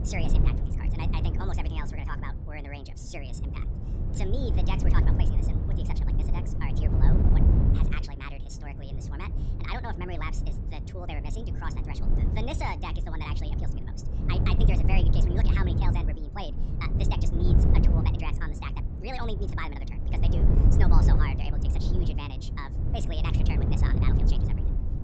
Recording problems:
wrong speed and pitch; too fast and too high; 1.5 times normal speed
high frequencies cut off; noticeable; nothing above 8 kHz
wind noise on the microphone; heavy; 2 dB below the speech

